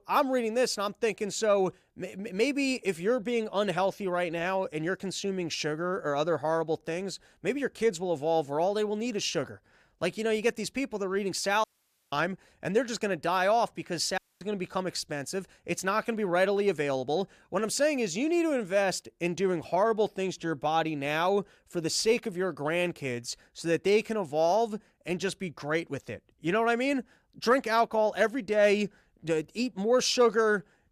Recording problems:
audio cutting out; at 12 s and at 14 s

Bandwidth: 14.5 kHz